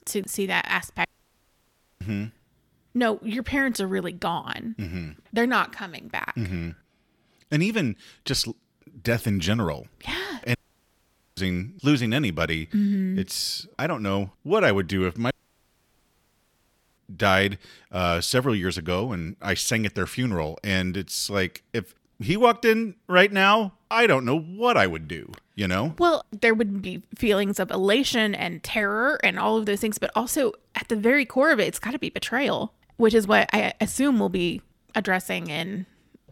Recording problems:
audio cutting out; at 1 s for 1 s, at 11 s for 1 s and at 15 s for 1.5 s

